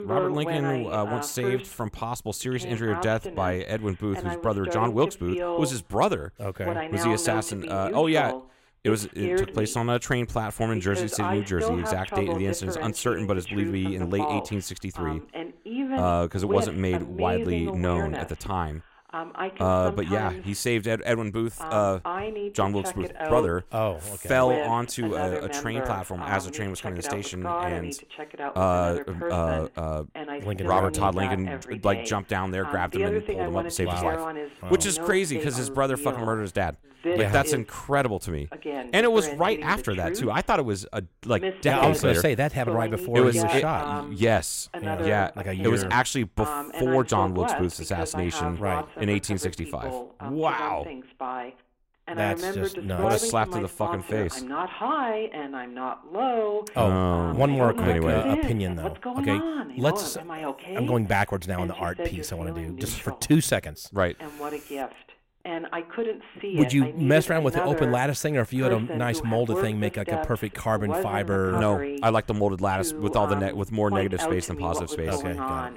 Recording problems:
voice in the background; loud; throughout; 6 dB below the speech

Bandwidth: 16 kHz